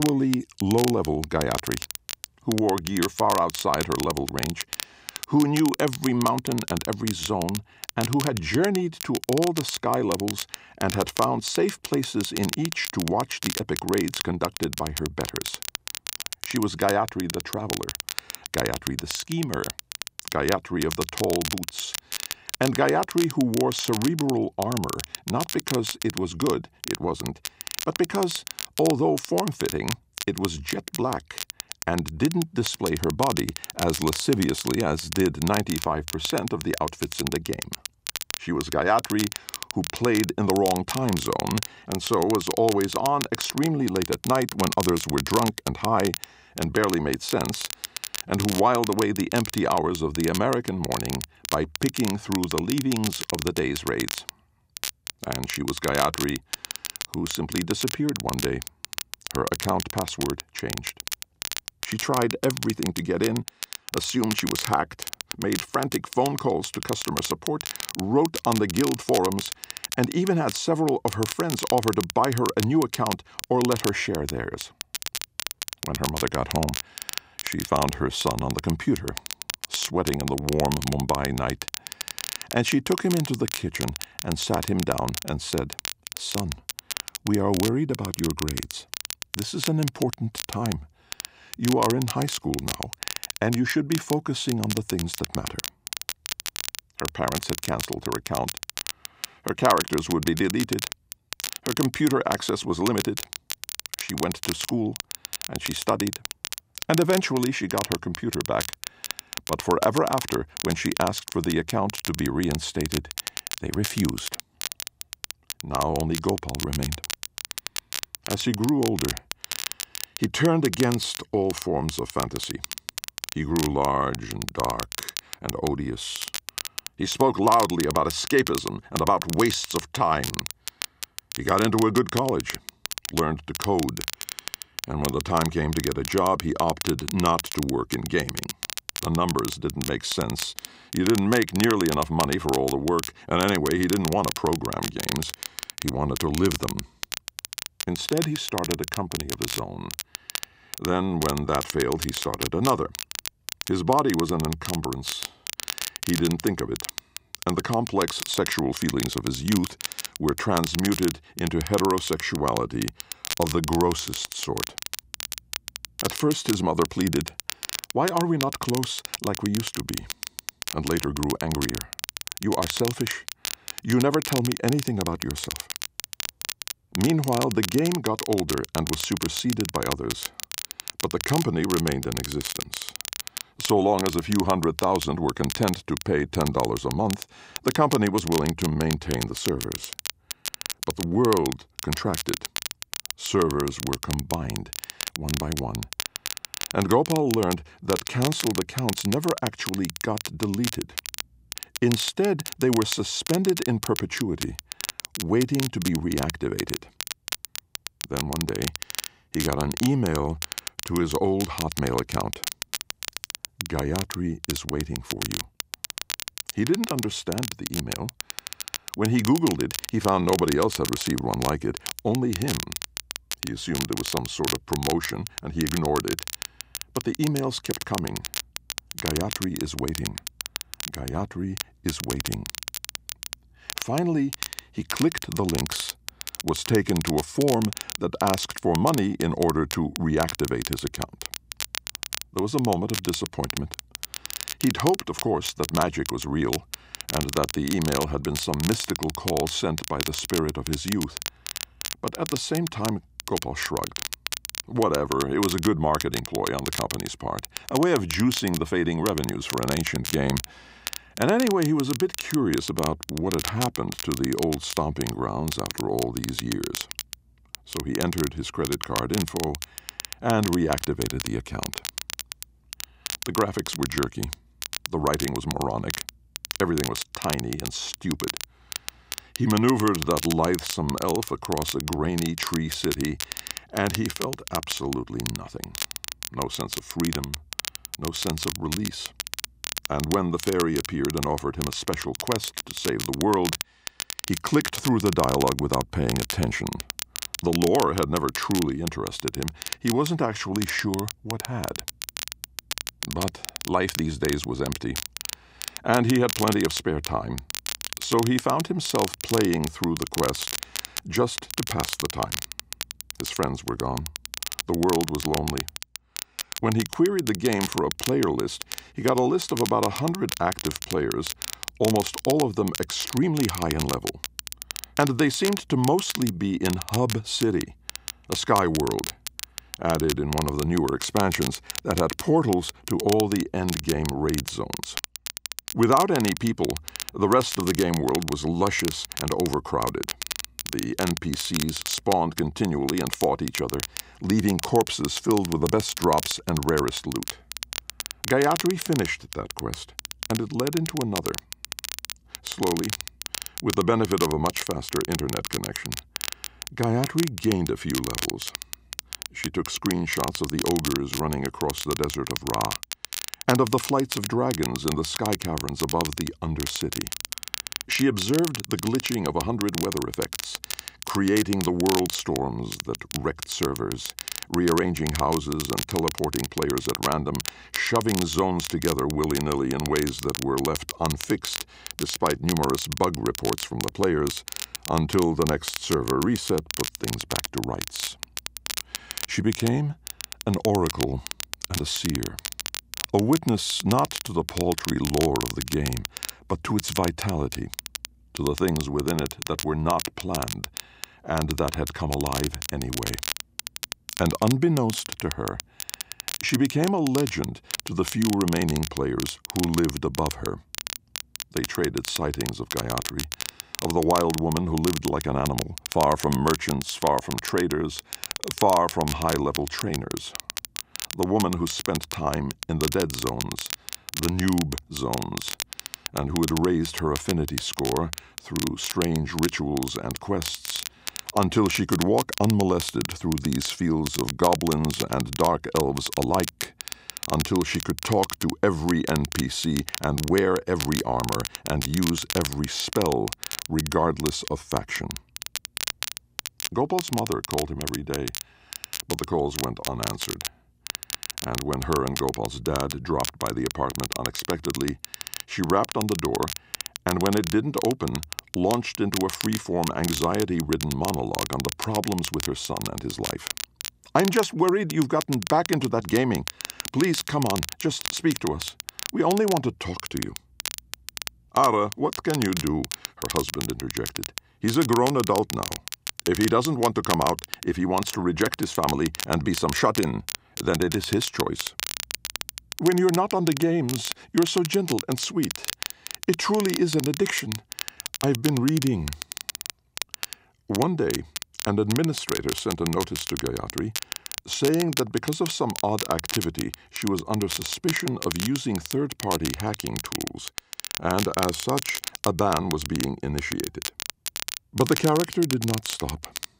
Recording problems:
crackle, like an old record; loud; 7 dB below the speech
abrupt cut into speech; at the start

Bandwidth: 15.5 kHz